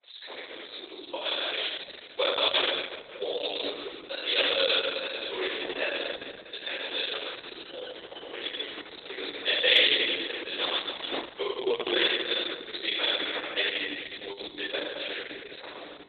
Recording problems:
room echo; strong; dies away in 2.1 s
off-mic speech; far
garbled, watery; badly; nothing above 4 kHz
thin; very; fading below 300 Hz
door banging; noticeable; from 7.5 to 11 s; peak 5 dB below the speech

